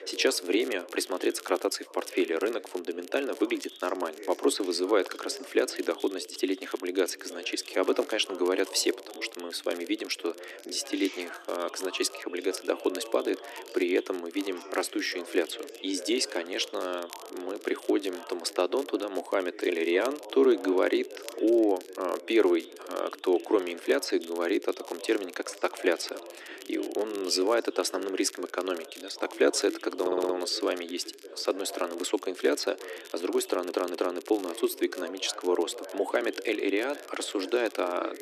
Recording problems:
thin; very; fading below 300 Hz
background chatter; noticeable; throughout; 2 voices, 15 dB below the speech
crackle, like an old record; faint; 20 dB below the speech
audio stuttering; at 30 s and at 33 s

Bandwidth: 13.5 kHz